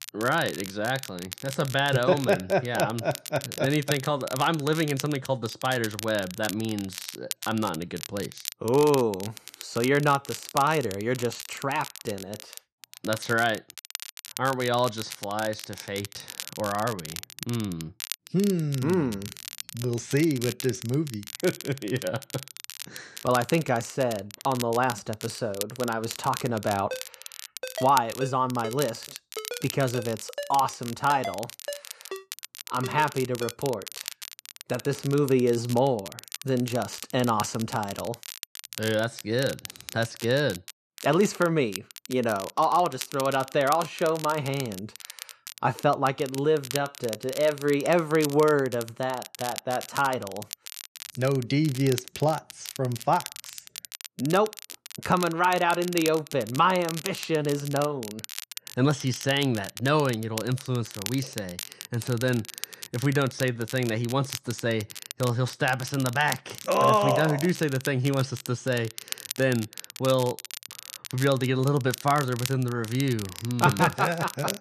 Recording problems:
crackle, like an old record; noticeable; 10 dB below the speech
phone ringing; noticeable; from 27 to 34 s; peak 9 dB below the speech

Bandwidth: 14 kHz